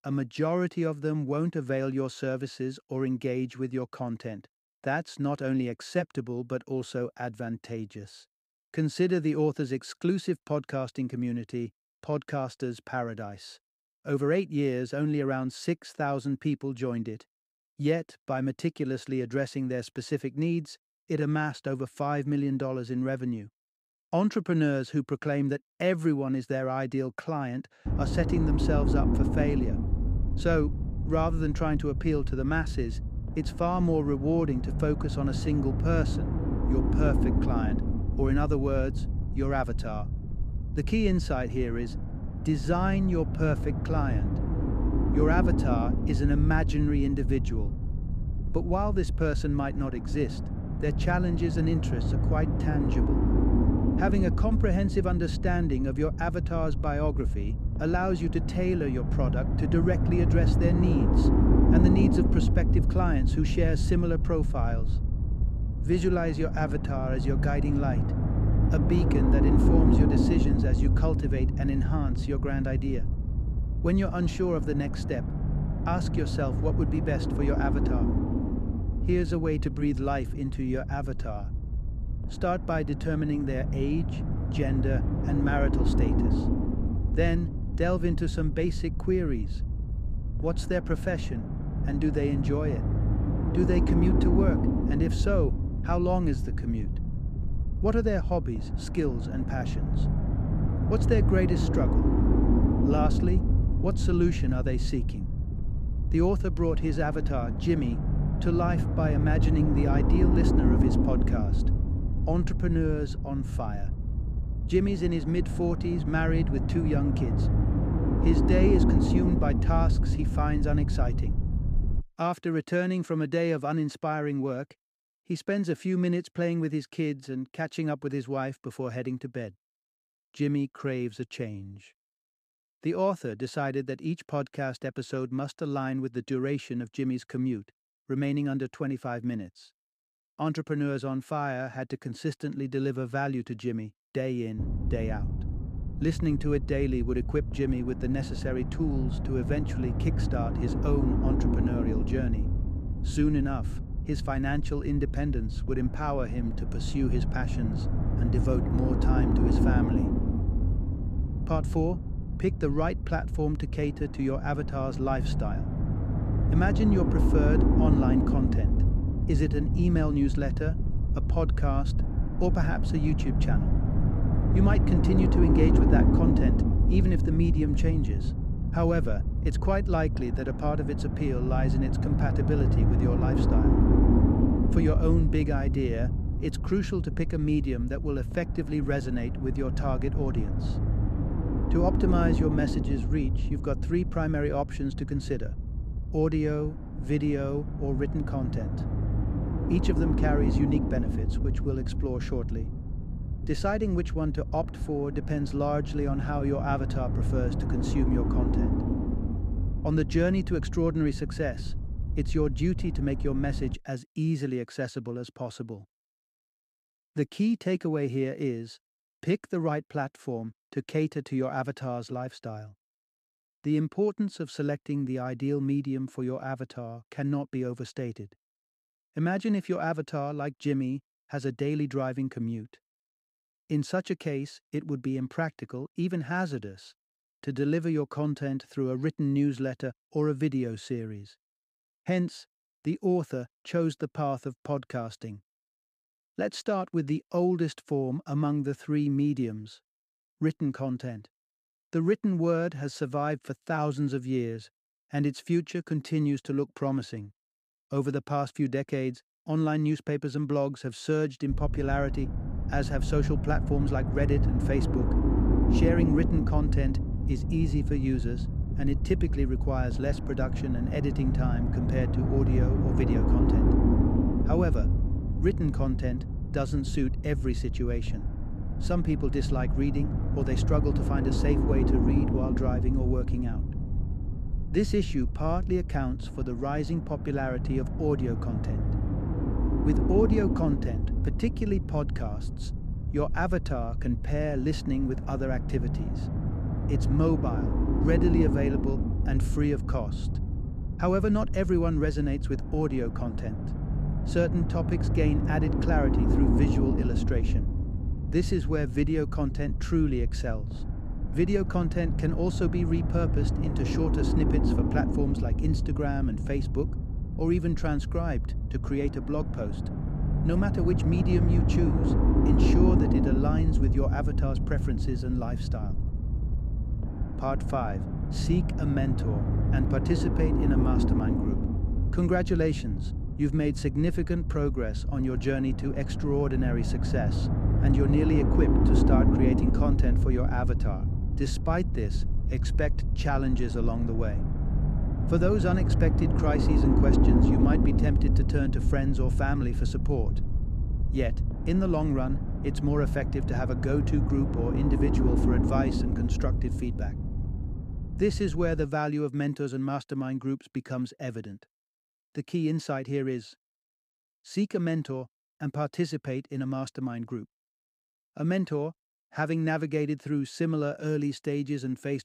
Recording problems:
low rumble; loud; from 28 s to 2:02, from 2:25 to 3:34 and from 4:22 to 5:59; 4 dB below the speech

